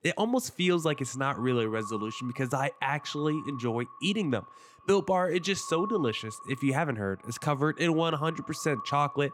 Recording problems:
echo of what is said; noticeable; throughout; 120 ms later, 15 dB below the speech

